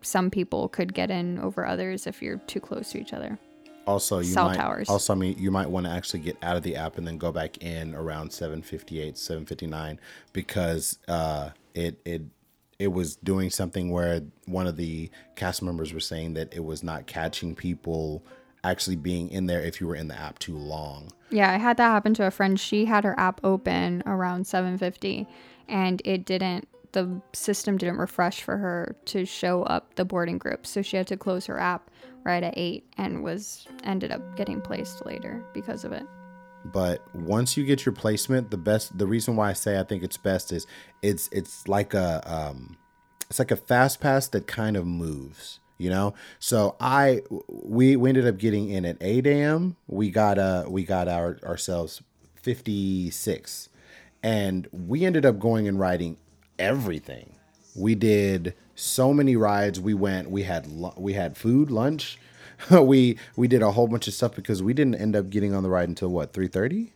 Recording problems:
background music; faint; throughout; 25 dB below the speech

